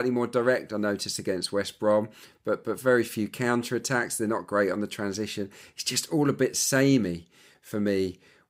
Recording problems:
abrupt cut into speech; at the start

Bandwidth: 15.5 kHz